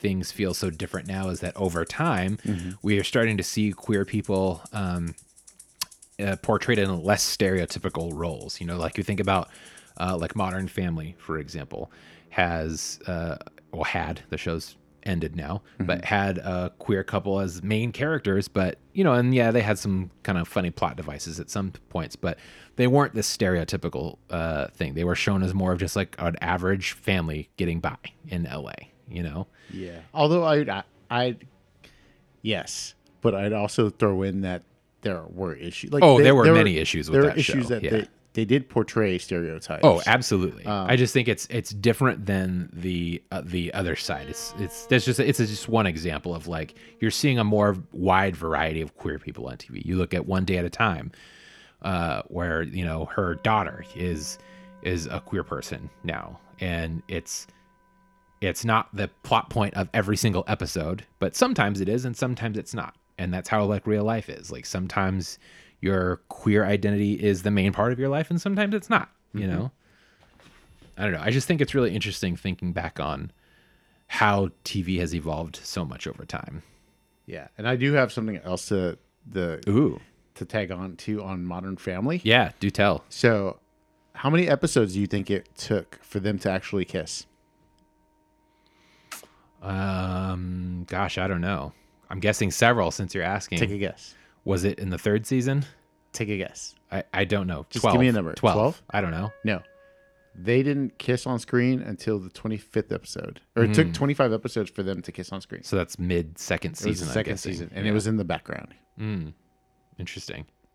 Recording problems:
background music; faint; throughout; 30 dB below the speech

